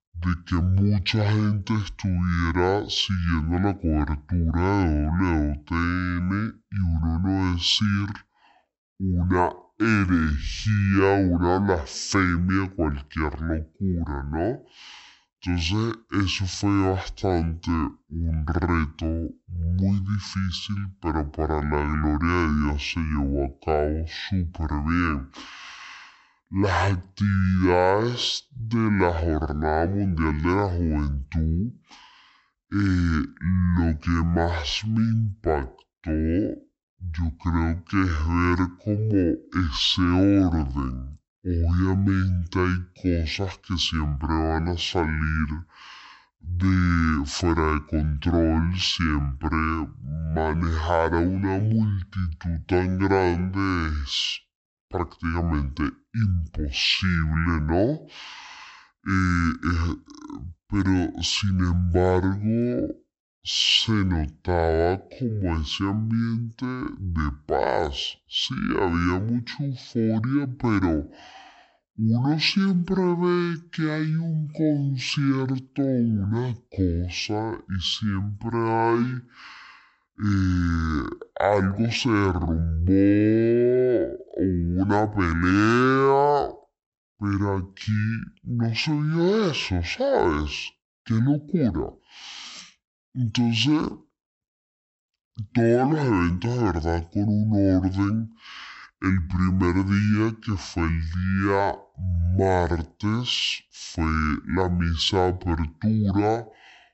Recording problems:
wrong speed and pitch; too slow and too low; 0.5 times normal speed

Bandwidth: 8 kHz